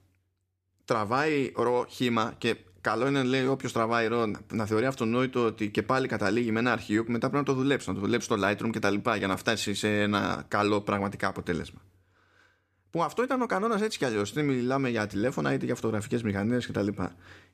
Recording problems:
none

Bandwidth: 14.5 kHz